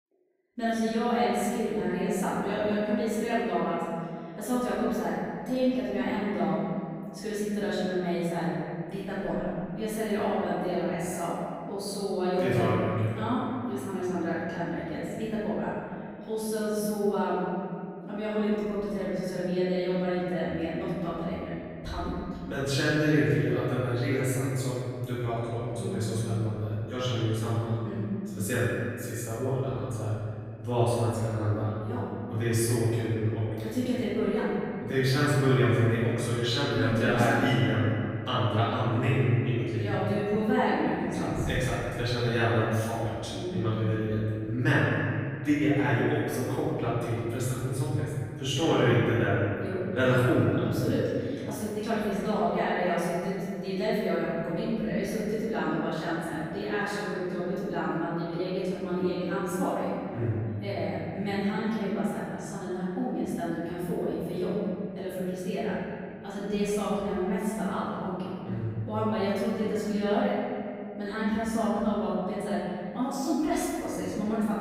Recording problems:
room echo; strong; dies away in 2.3 s
off-mic speech; far

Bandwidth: 15.5 kHz